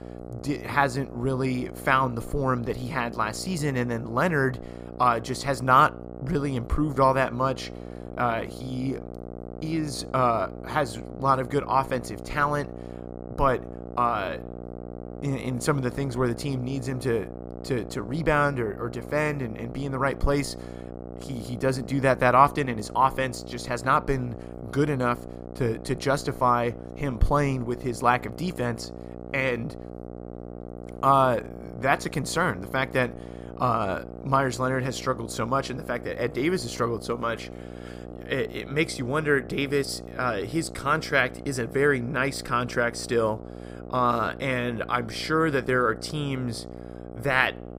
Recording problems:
electrical hum; noticeable; throughout; 60 Hz, 15 dB below the speech

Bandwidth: 15.5 kHz